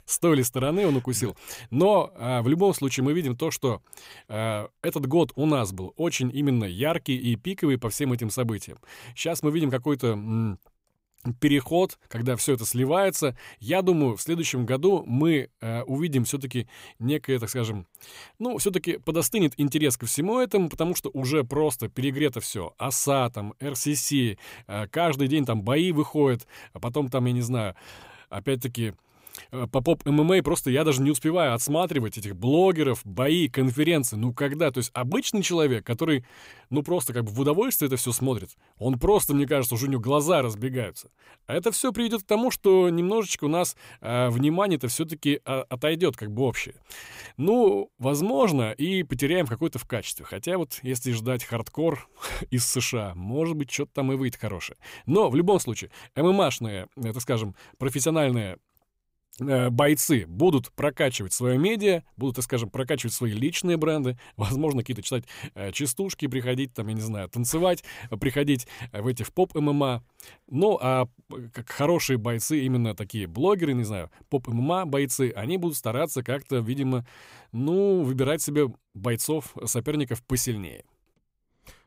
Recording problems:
none

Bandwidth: 15.5 kHz